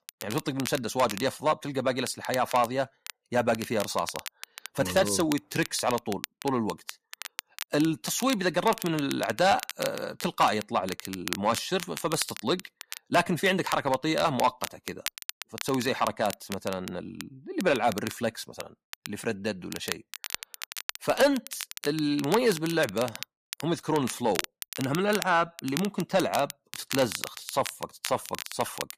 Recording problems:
distortion; slight; 10 dB below the speech
crackle, like an old record; noticeable; 10 dB below the speech

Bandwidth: 14.5 kHz